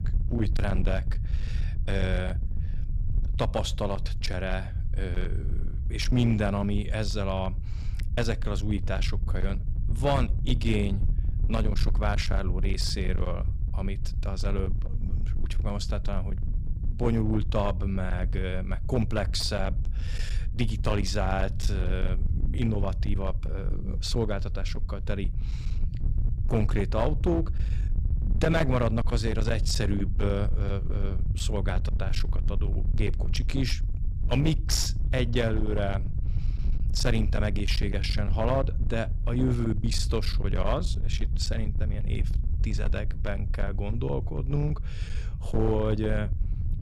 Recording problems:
distortion; slight; 15% of the sound clipped
low rumble; noticeable; throughout; 10 dB below the speech

